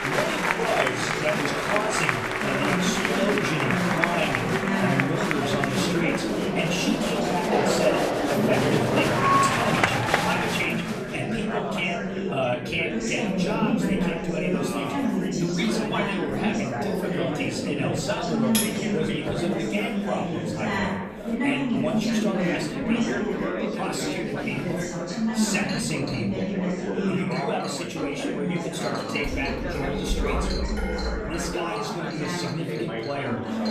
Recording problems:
off-mic speech; far
room echo; slight; dies away in 0.4 s
chatter from many people; very loud; throughout; 4 dB above the speech
background music; loud; throughout; 7 dB below the speech
household noises; noticeable; throughout; 15 dB below the speech
clattering dishes; loud; at 19 s; peak 4 dB above the speech
clattering dishes; noticeable; from 24 to 25 s and from 29 to 32 s; peak level with the speech

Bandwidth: 13.5 kHz